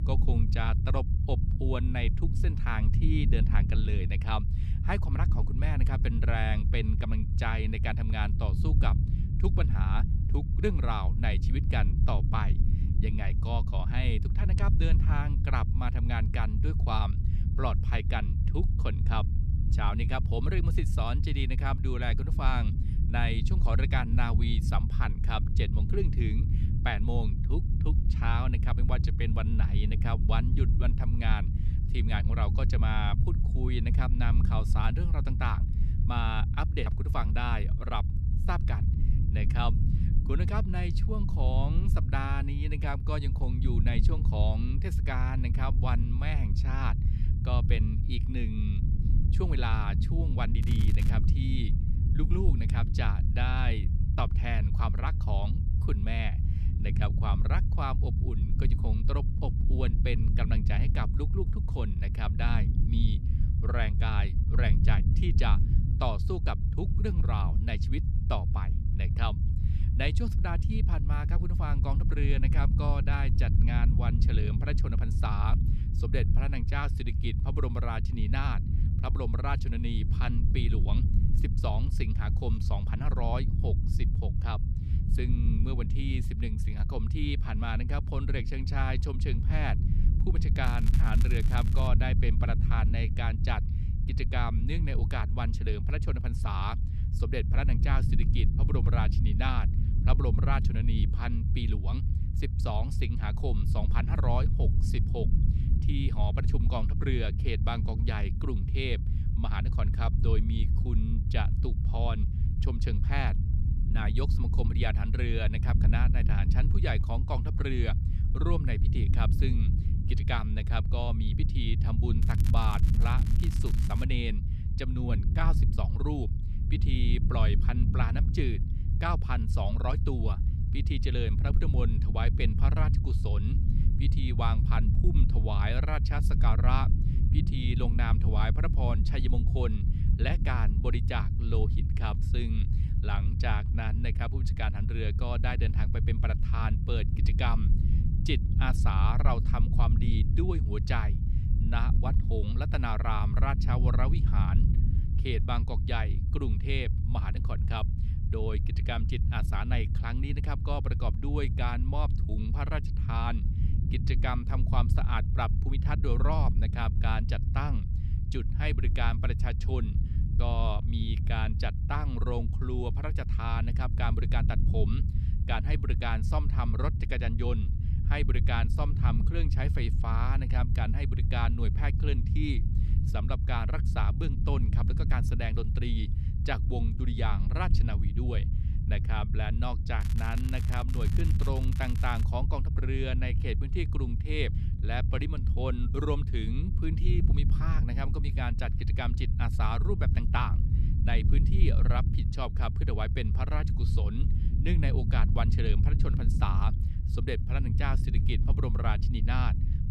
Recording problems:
low rumble; loud; throughout; 7 dB below the speech
crackling; noticeable; 4 times, first at 51 s; 15 dB below the speech

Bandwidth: 14 kHz